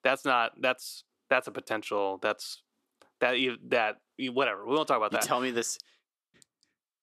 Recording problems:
thin; somewhat; fading below 350 Hz

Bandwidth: 13.5 kHz